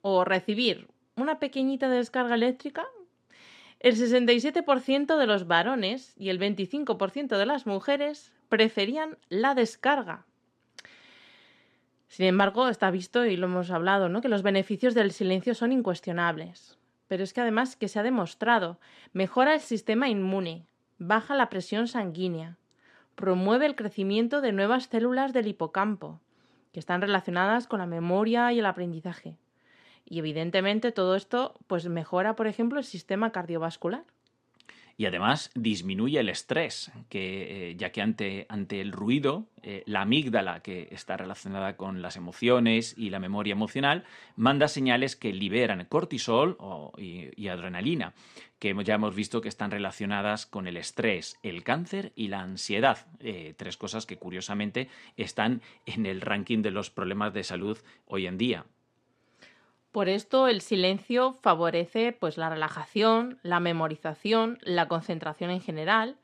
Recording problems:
none

